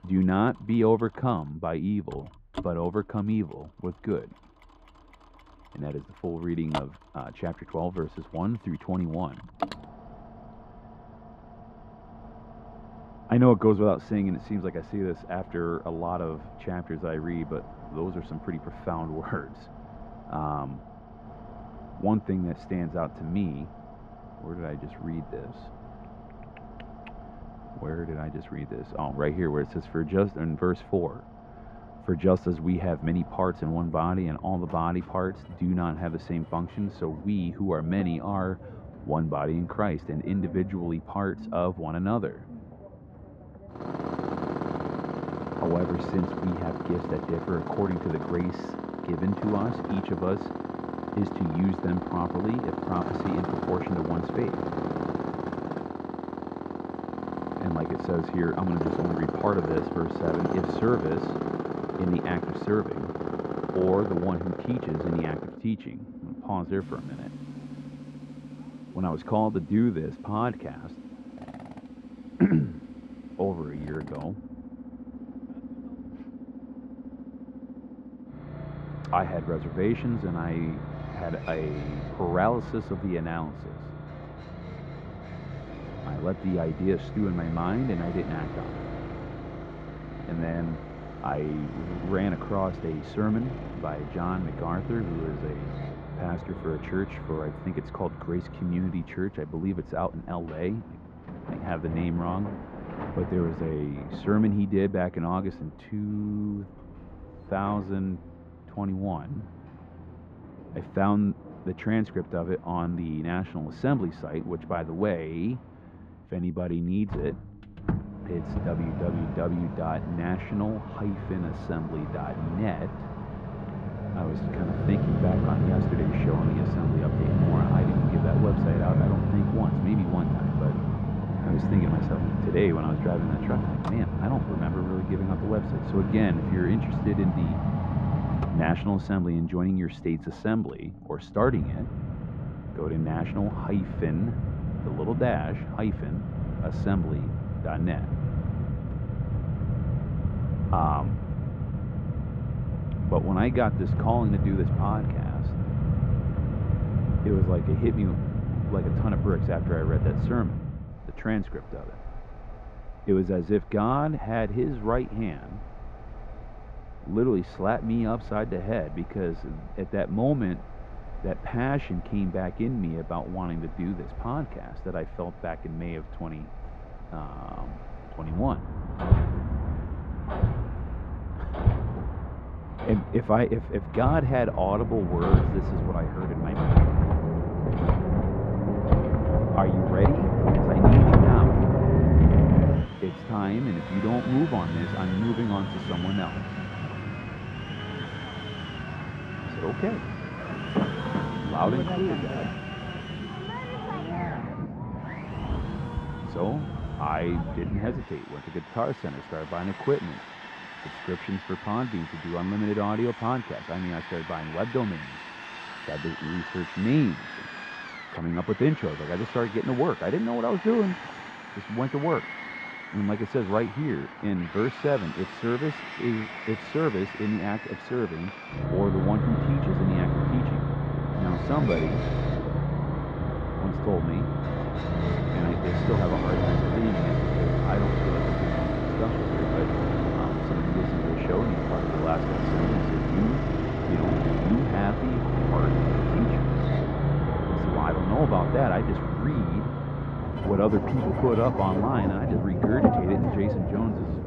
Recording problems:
muffled; very; fading above 1.5 kHz
machinery noise; very loud; throughout; as loud as the speech

